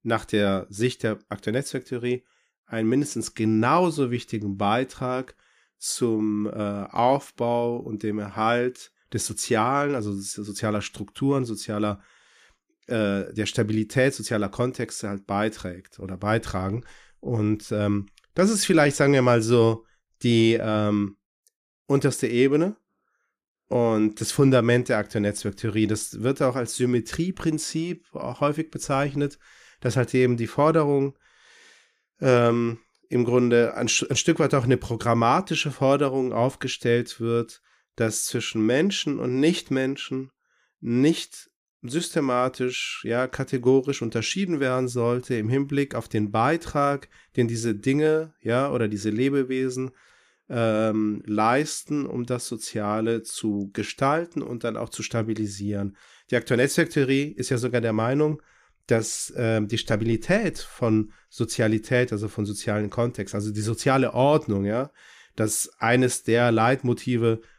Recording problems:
none

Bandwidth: 15 kHz